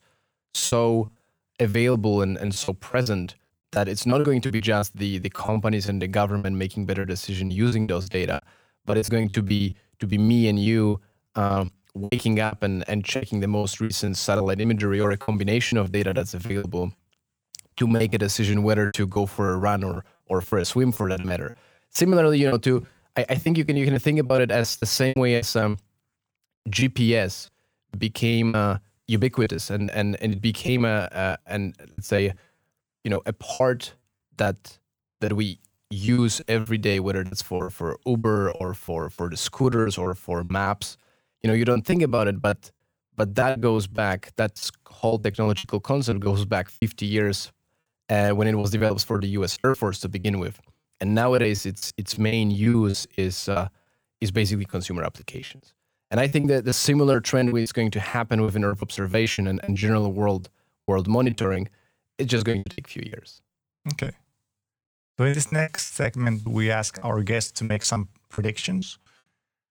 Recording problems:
choppy; very; 15% of the speech affected

